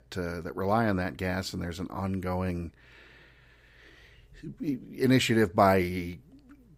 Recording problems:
none

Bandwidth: 15.5 kHz